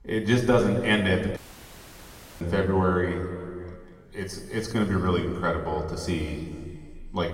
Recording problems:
room echo; noticeable; dies away in 2.1 s
off-mic speech; somewhat distant
audio cutting out; at 1.5 s for 1 s

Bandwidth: 16 kHz